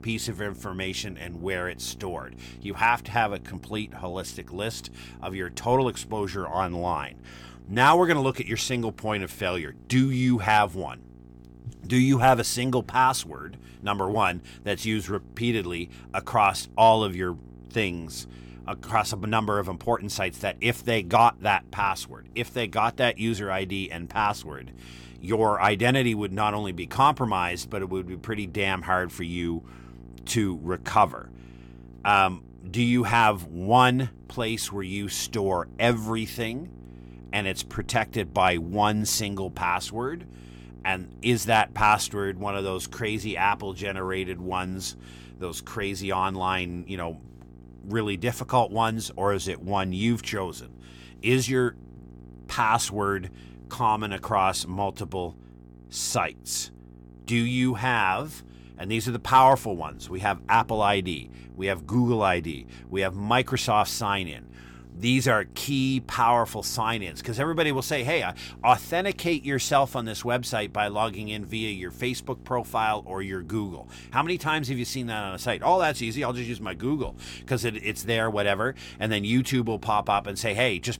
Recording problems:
electrical hum; faint; throughout; 60 Hz, 30 dB below the speech

